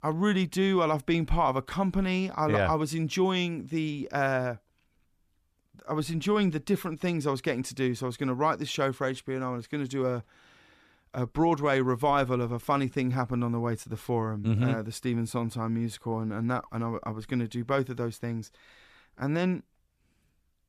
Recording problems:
none

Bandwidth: 14.5 kHz